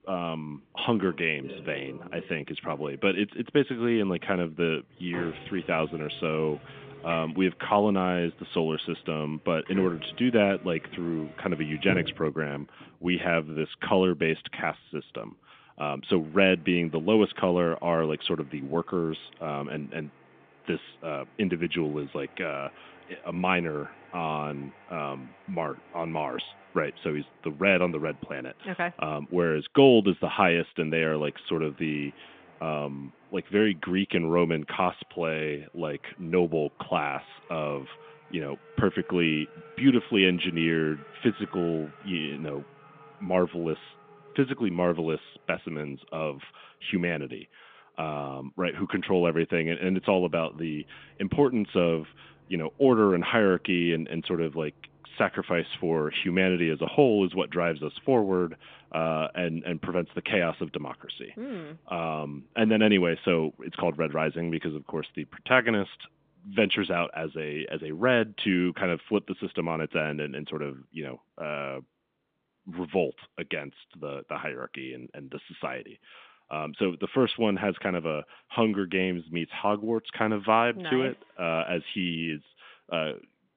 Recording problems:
phone-call audio; nothing above 3.5 kHz
traffic noise; faint; throughout; 20 dB below the speech

